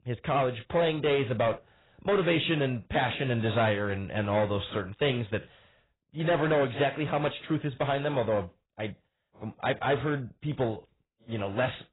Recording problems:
garbled, watery; badly; nothing above 4 kHz
distortion; slight; 6% of the sound clipped

